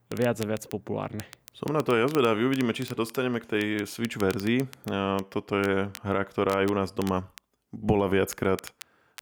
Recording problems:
crackle, like an old record; noticeable; 20 dB below the speech

